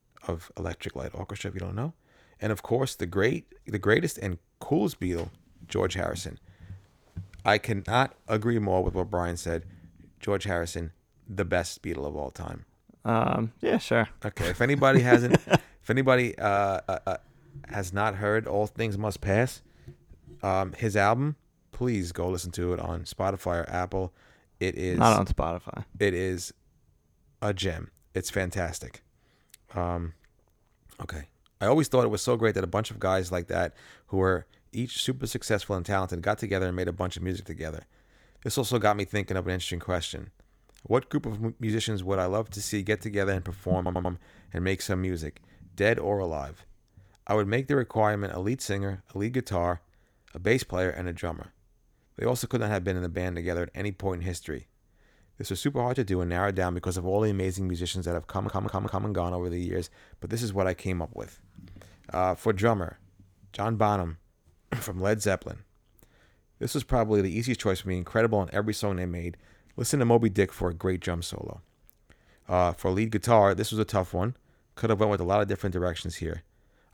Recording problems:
audio stuttering; at 17 s, at 44 s and at 58 s

